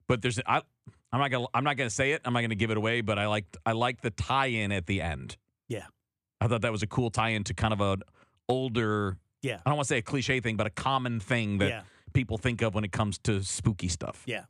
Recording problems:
none

